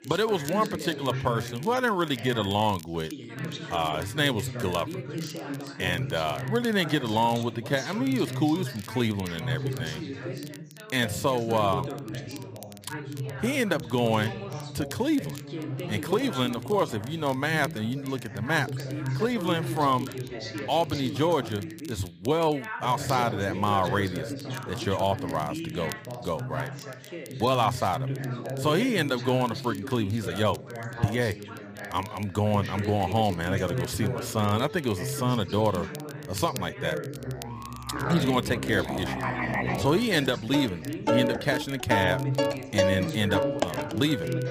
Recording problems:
background music; loud; from 35 s on; 4 dB below the speech
background chatter; loud; throughout; 3 voices, 8 dB below the speech
crackle, like an old record; faint; 20 dB below the speech

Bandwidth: 15 kHz